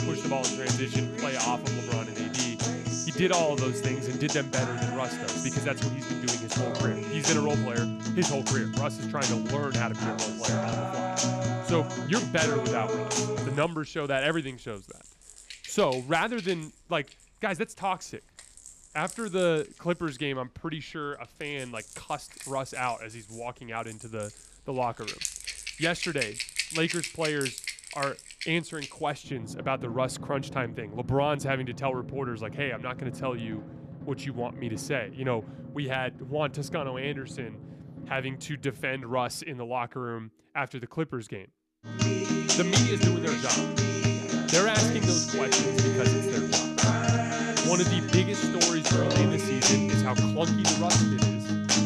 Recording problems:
background music; very loud; throughout; 4 dB above the speech

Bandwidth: 13.5 kHz